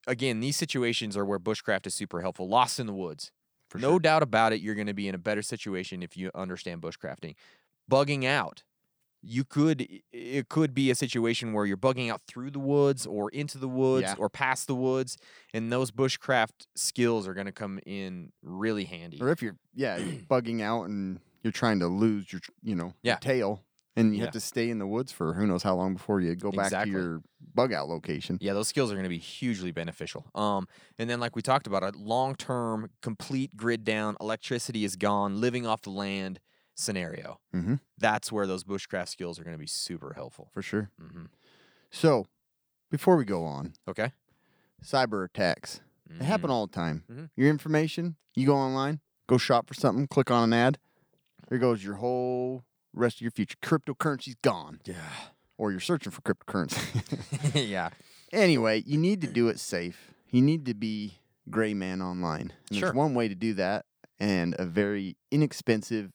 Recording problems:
none

